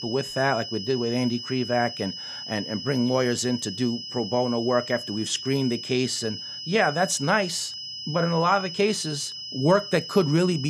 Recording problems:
high-pitched whine; loud; throughout; 5 kHz, 8 dB below the speech
abrupt cut into speech; at the end

